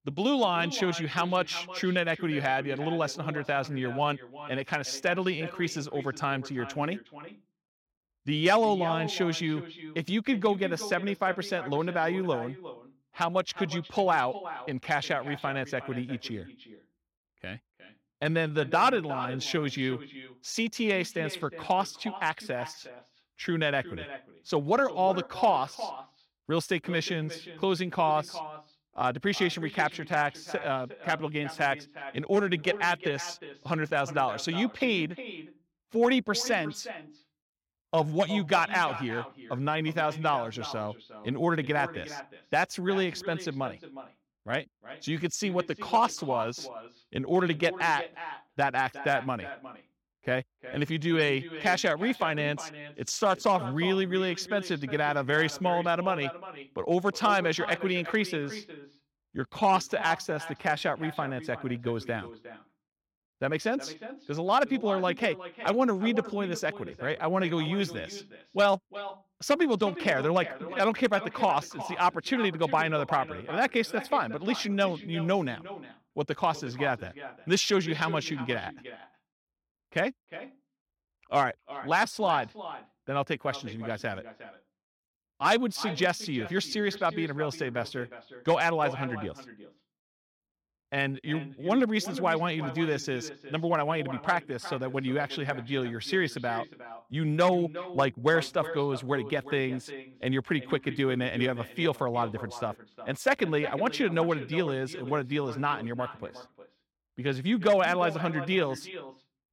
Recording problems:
echo of what is said; noticeable; throughout; 360 ms later, 15 dB below the speech

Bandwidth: 16.5 kHz